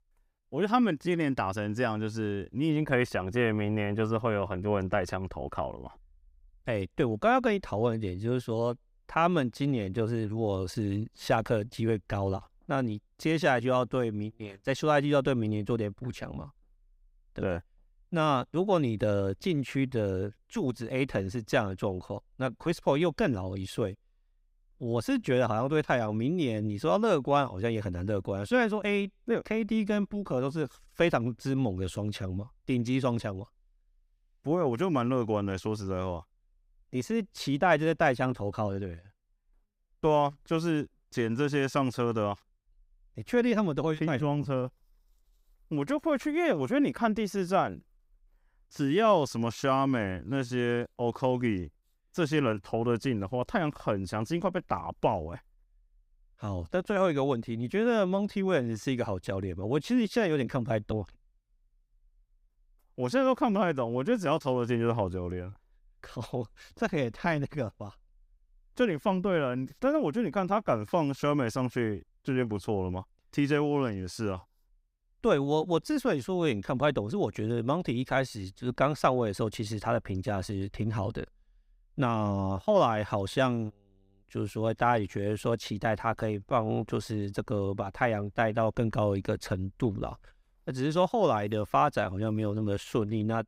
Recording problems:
none

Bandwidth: 15.5 kHz